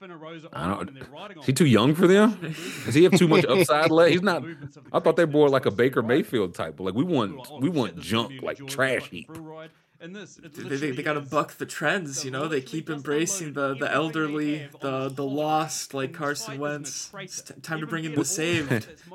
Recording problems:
voice in the background; noticeable; throughout; 20 dB below the speech

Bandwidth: 16.5 kHz